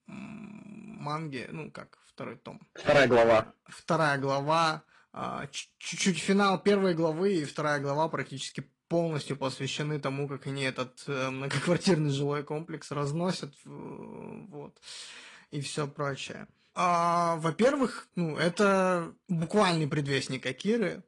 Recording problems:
distortion; slight; 1.3% of the sound clipped
garbled, watery; slightly

